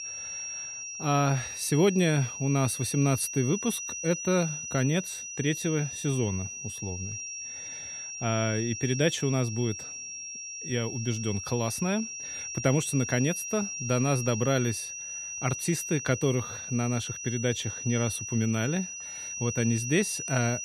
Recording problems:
high-pitched whine; loud; throughout; 6 kHz, 6 dB below the speech

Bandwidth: 13.5 kHz